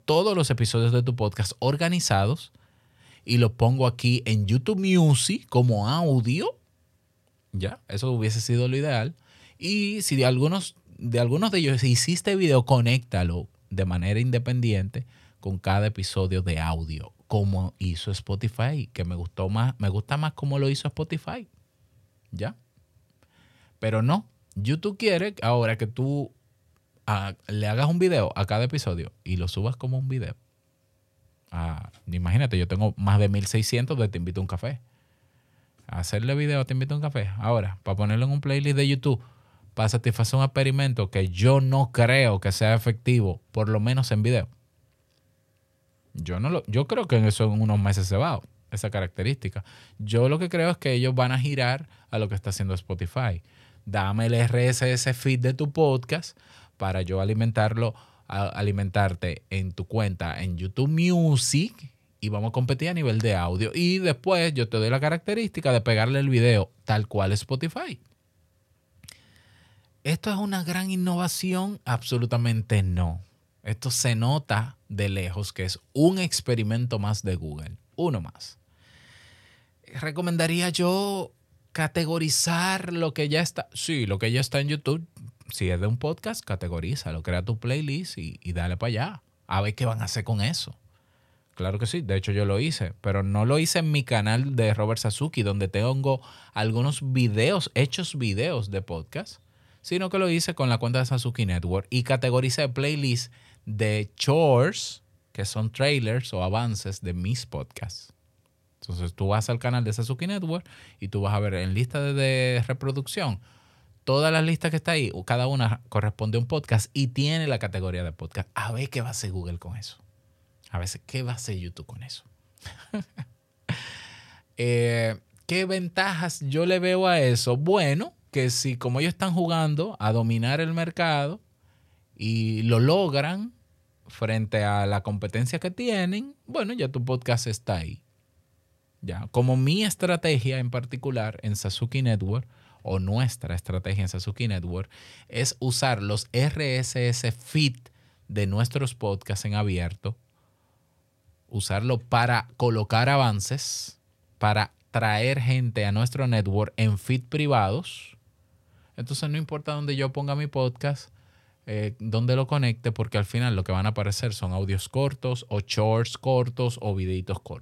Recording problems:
none

